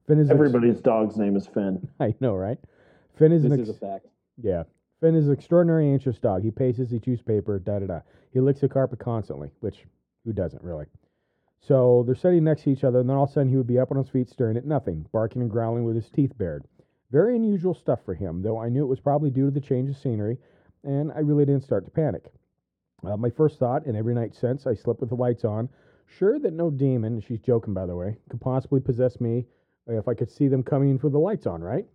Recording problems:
muffled; very; fading above 1 kHz

